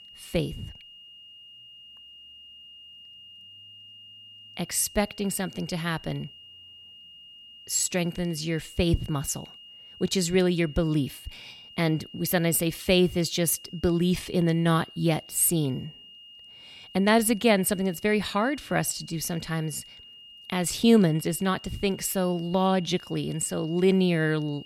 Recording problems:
high-pitched whine; noticeable; throughout; 3 kHz, 20 dB below the speech

